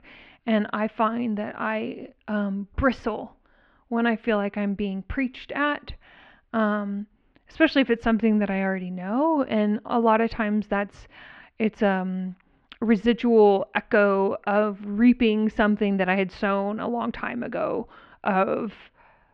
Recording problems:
muffled; very; fading above 3 kHz

